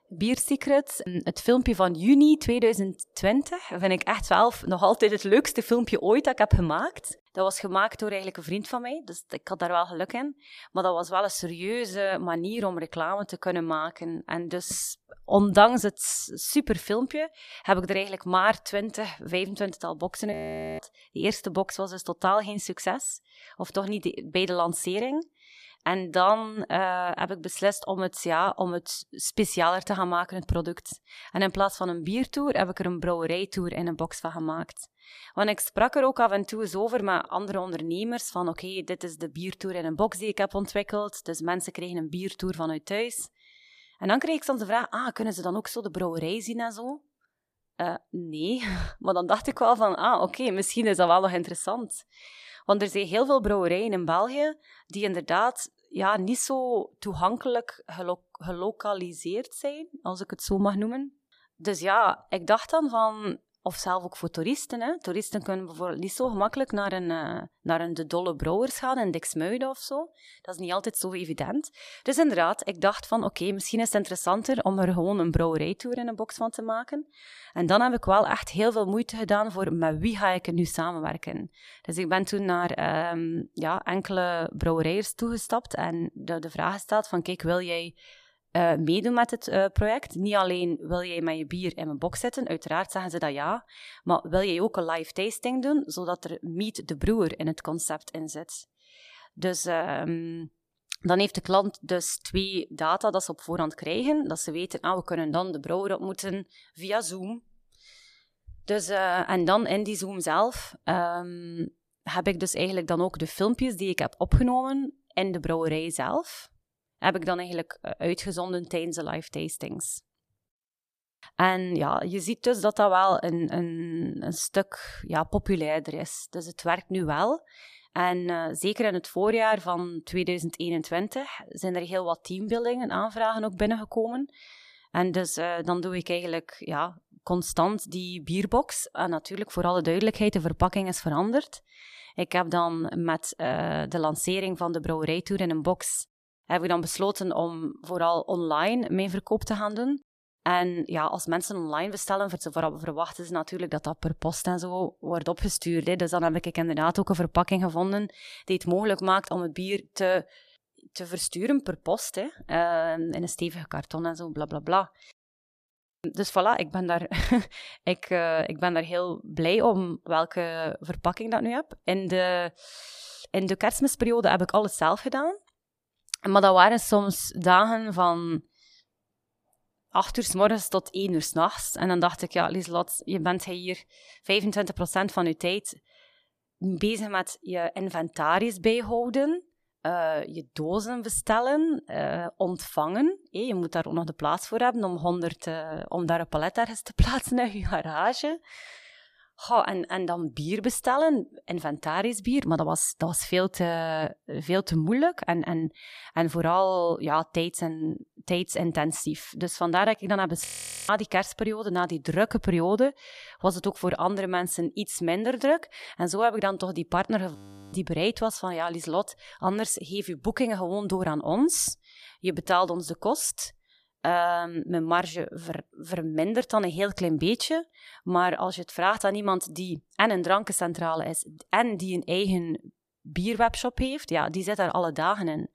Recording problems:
audio freezing; at 20 s, at 3:30 and at 3:37

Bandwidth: 14.5 kHz